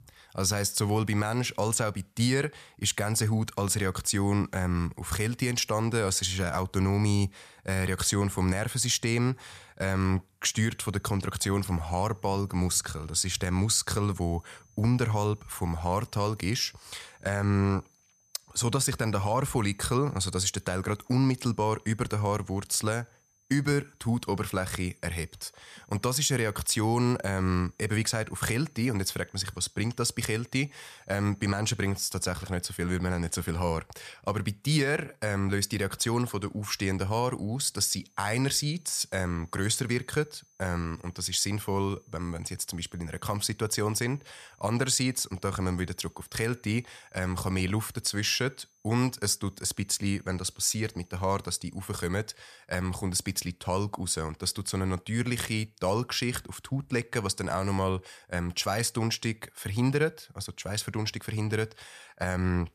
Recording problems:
high-pitched whine; faint; from 11 to 32 s and from 38 to 52 s; 6 kHz, 35 dB below the speech

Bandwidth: 14.5 kHz